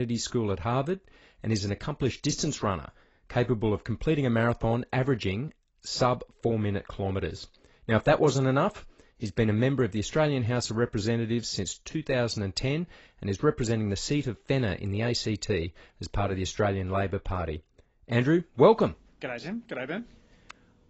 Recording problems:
garbled, watery; badly; nothing above 7.5 kHz
abrupt cut into speech; at the start

